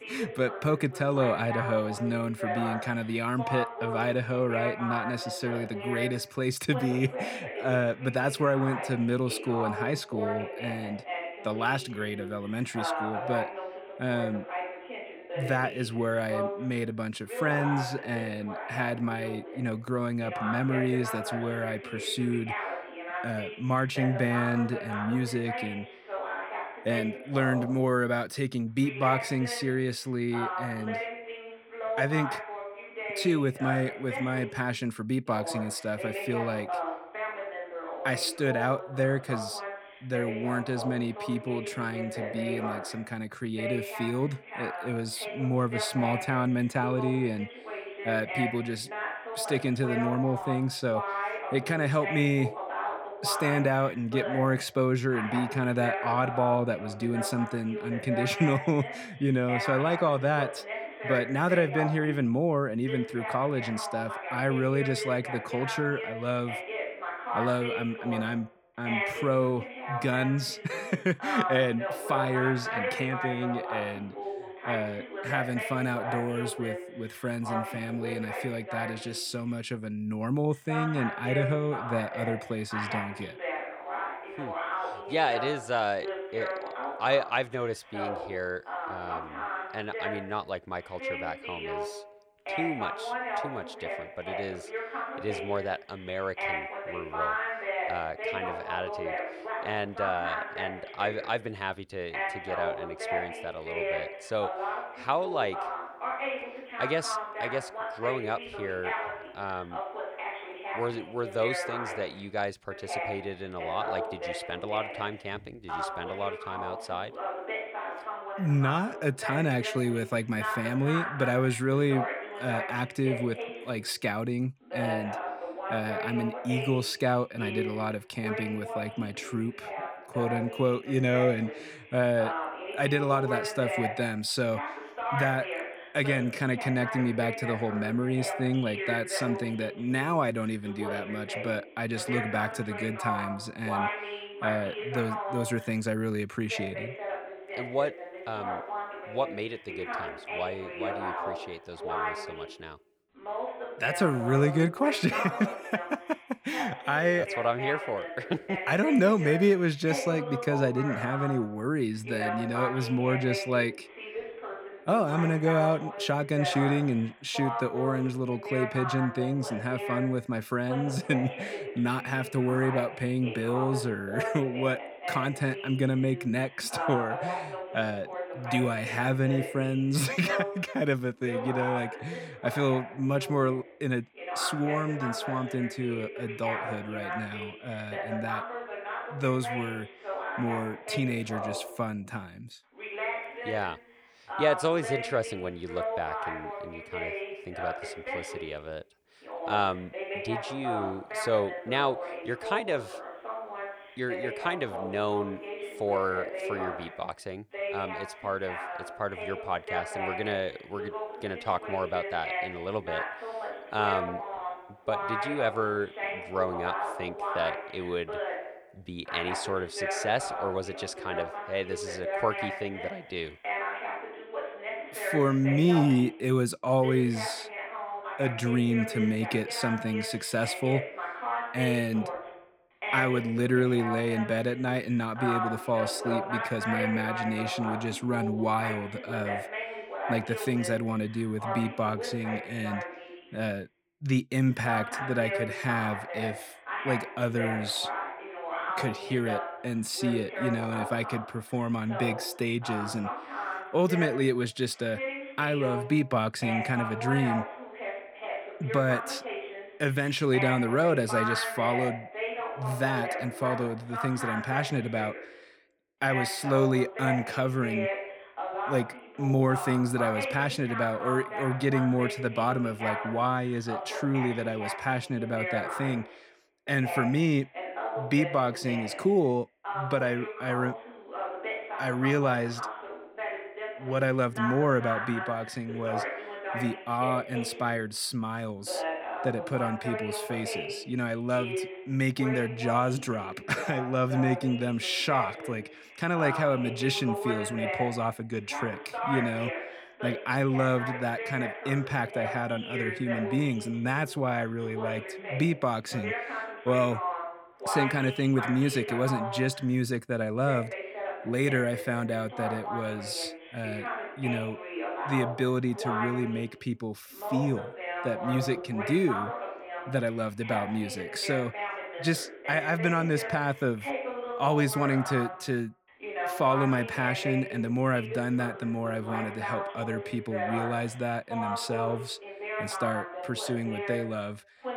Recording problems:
voice in the background; loud; throughout; 6 dB below the speech

